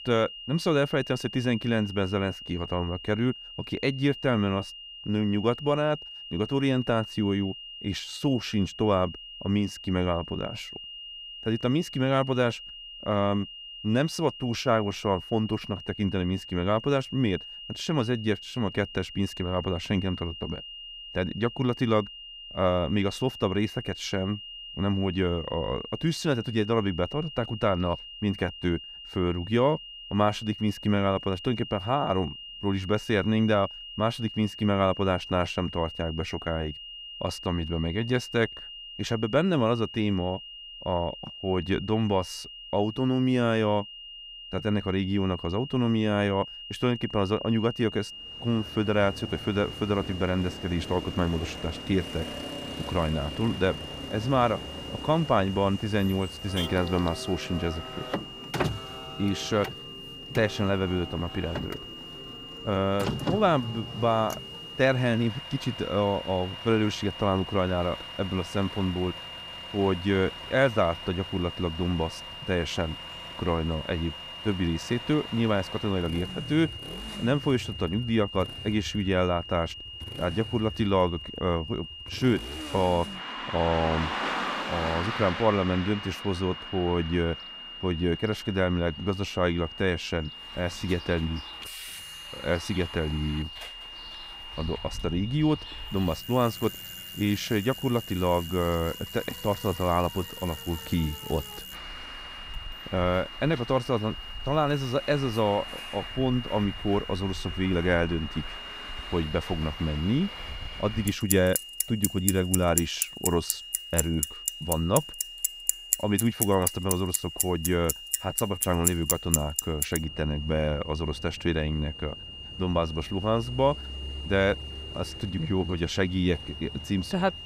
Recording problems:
traffic noise; loud; from 48 s on; 8 dB below the speech
high-pitched whine; noticeable; throughout; 3 kHz, 10 dB below the speech

